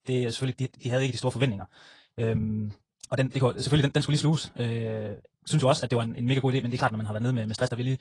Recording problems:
wrong speed, natural pitch; too fast; 1.8 times normal speed
garbled, watery; slightly

